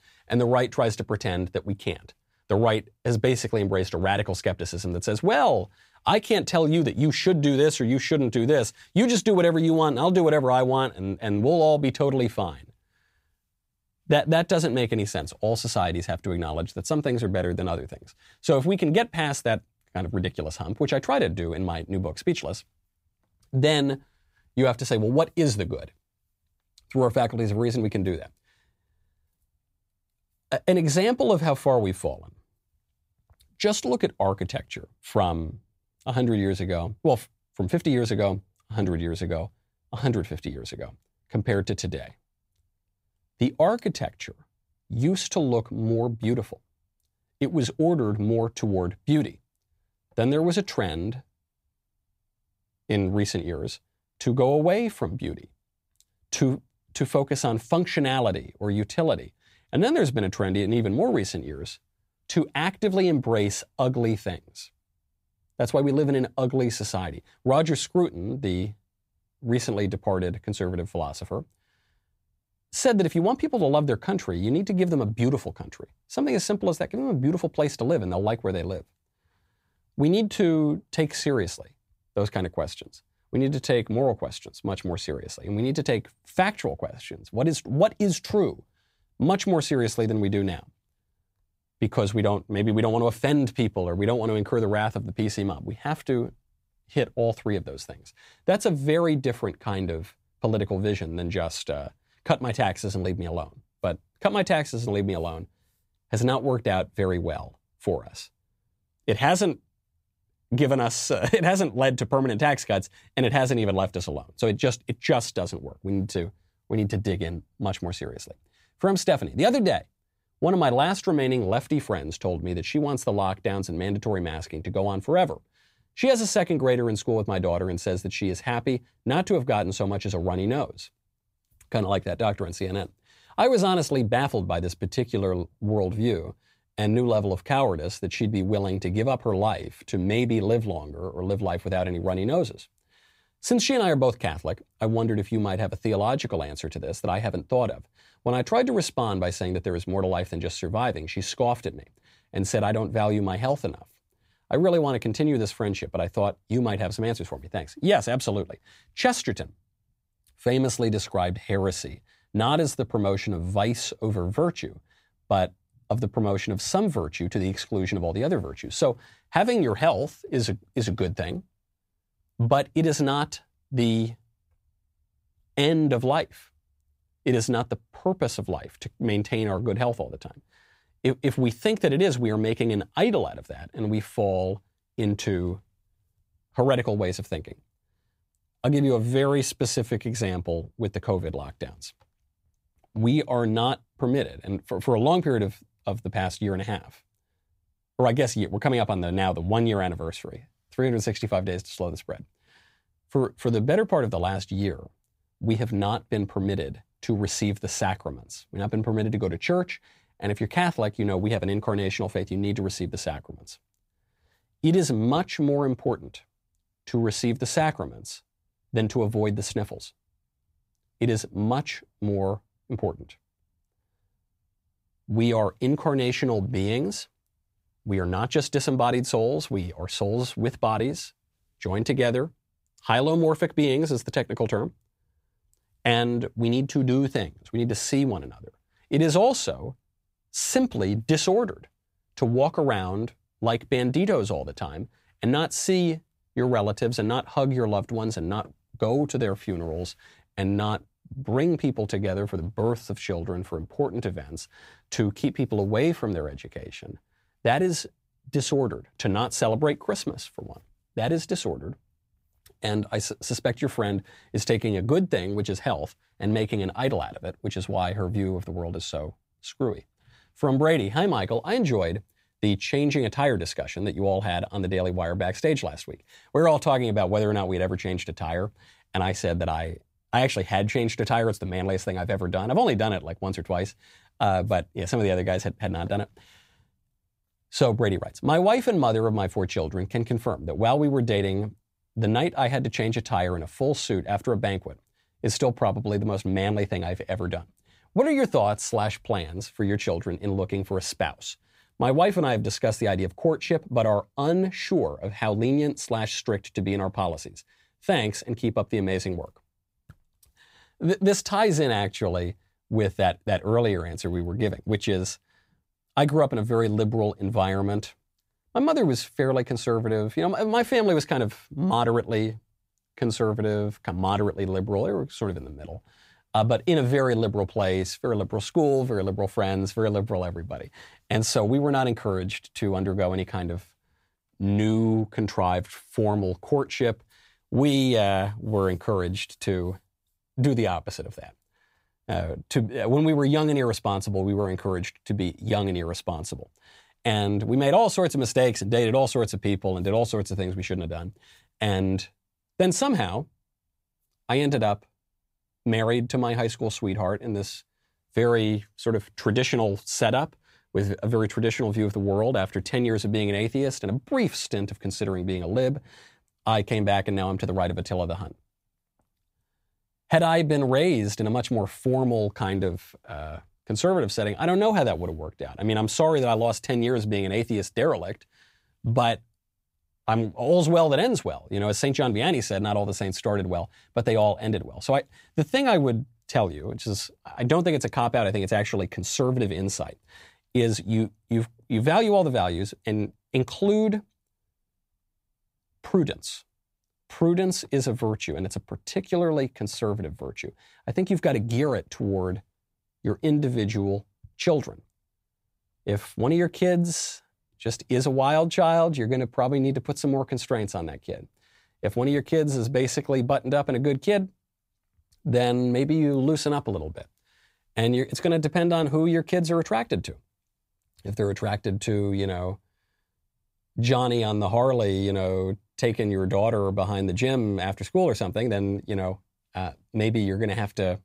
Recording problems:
none

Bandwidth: 15.5 kHz